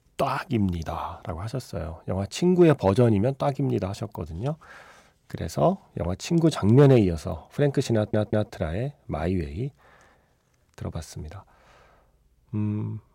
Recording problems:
audio stuttering; at 8 s

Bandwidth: 16 kHz